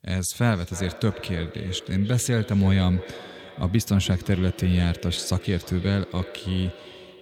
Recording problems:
echo of what is said; noticeable; throughout; 310 ms later, 15 dB below the speech

